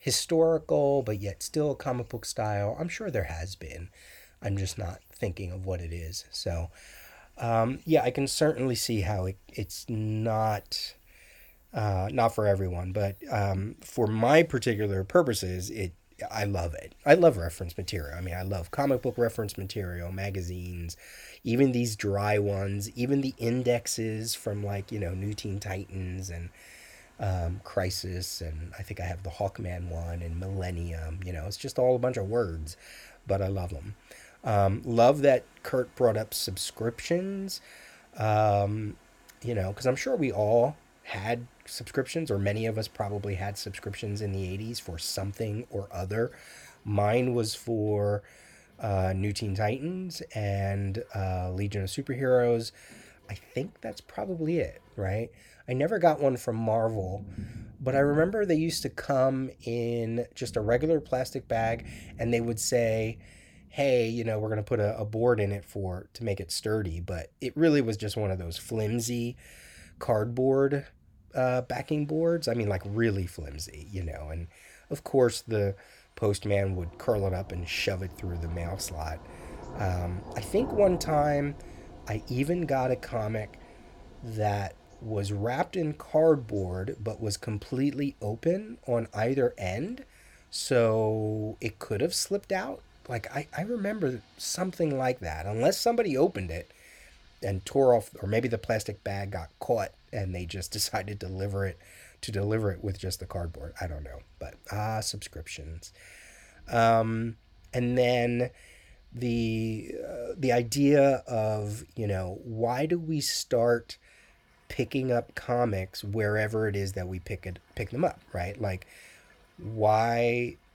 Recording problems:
rain or running water; faint; throughout; 25 dB below the speech

